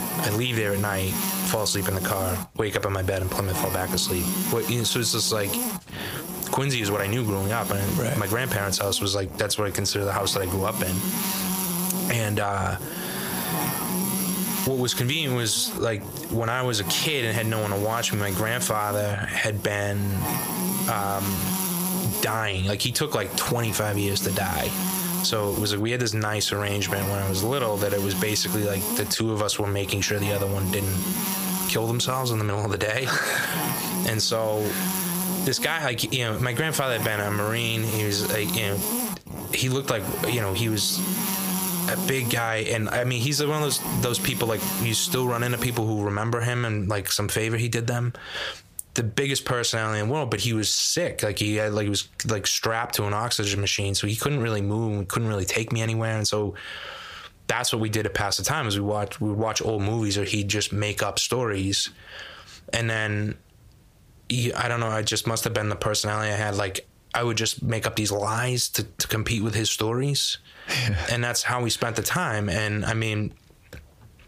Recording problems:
squashed, flat; heavily
electrical hum; loud; until 46 s; 50 Hz, 7 dB below the speech

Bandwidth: 15 kHz